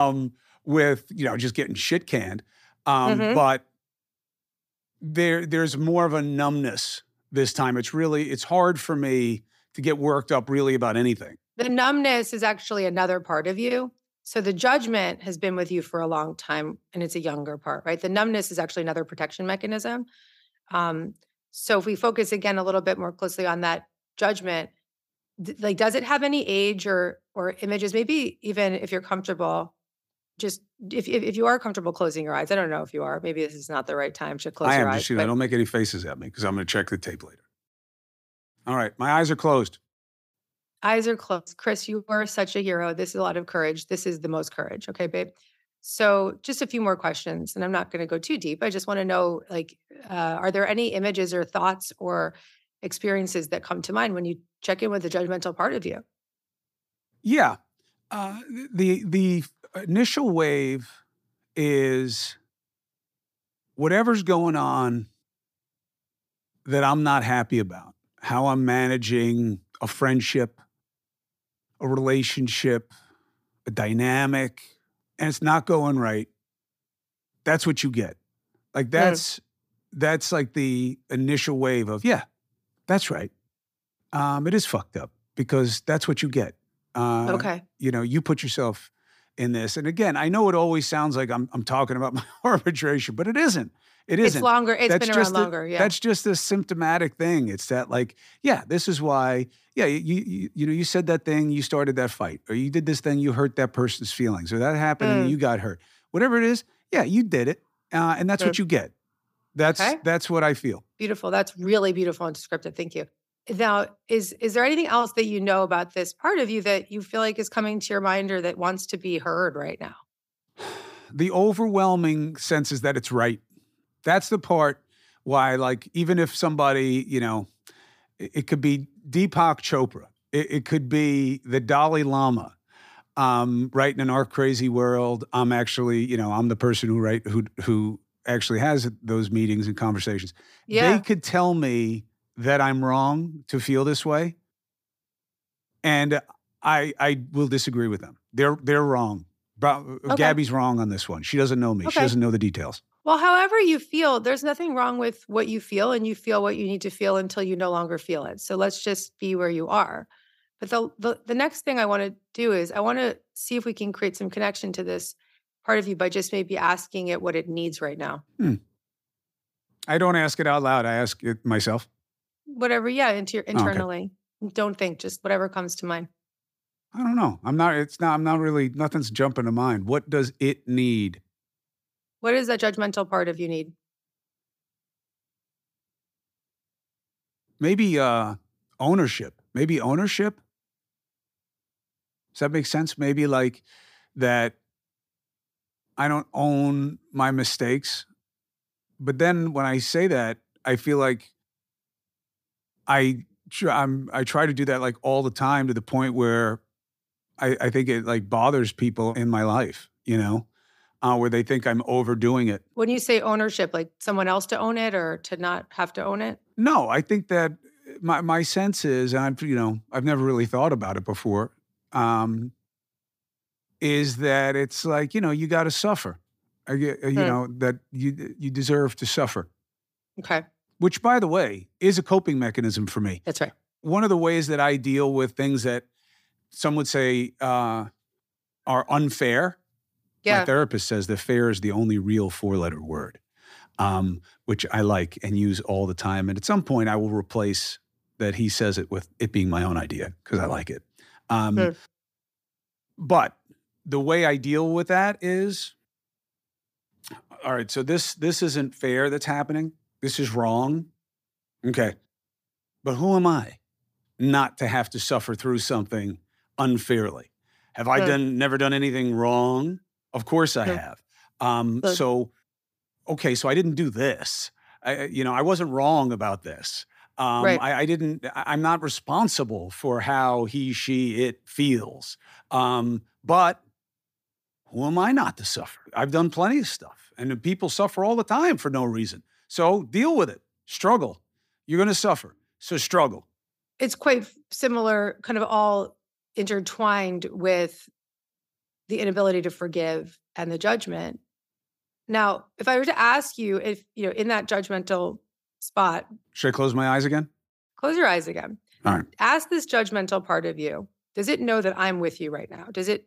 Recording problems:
abrupt cut into speech; at the start

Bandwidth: 15 kHz